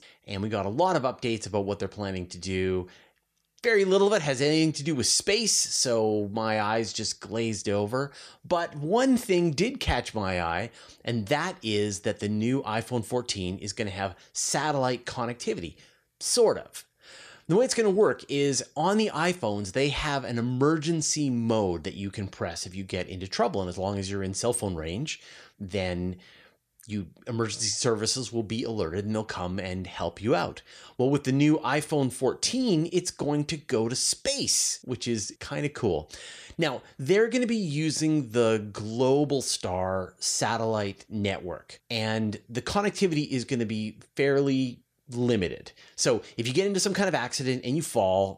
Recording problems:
none

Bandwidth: 14.5 kHz